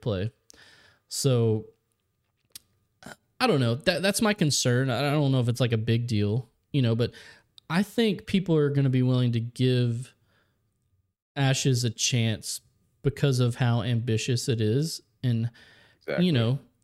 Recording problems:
none

